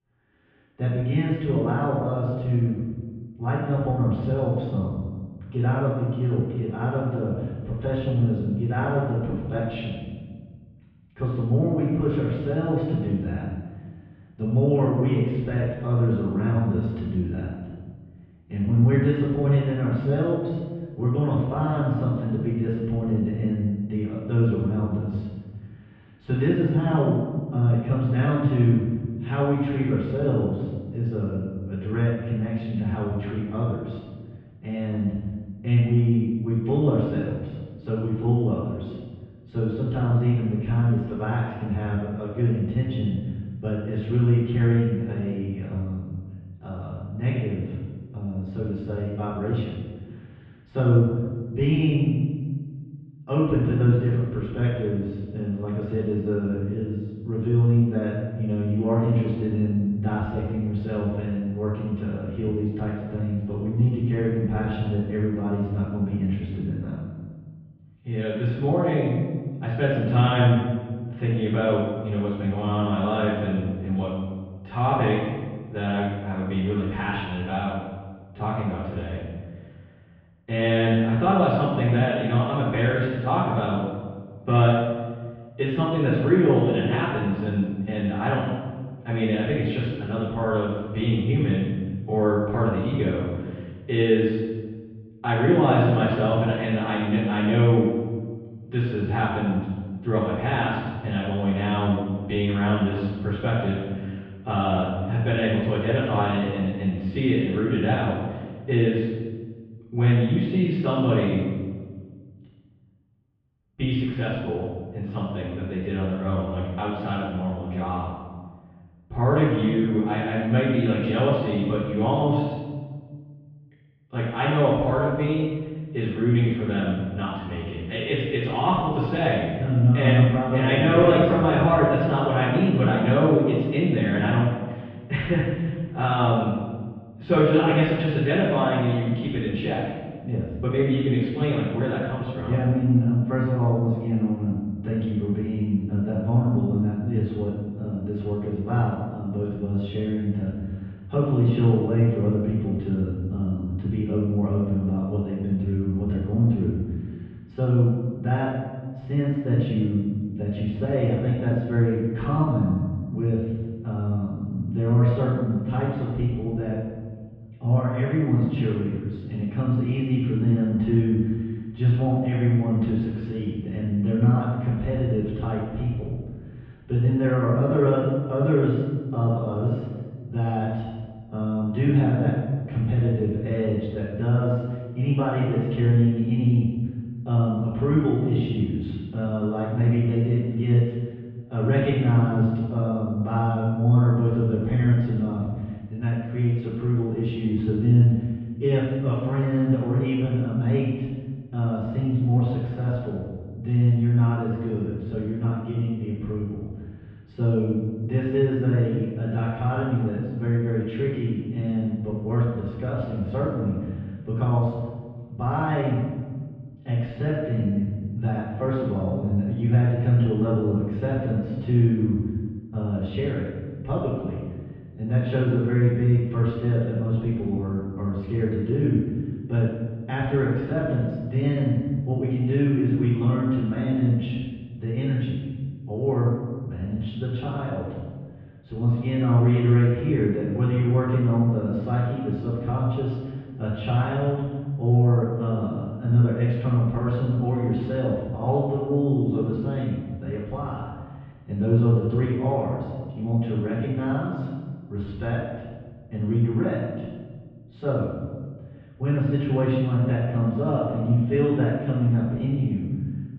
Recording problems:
room echo; strong; dies away in 1.3 s
off-mic speech; far
muffled; very; fading above 3 kHz

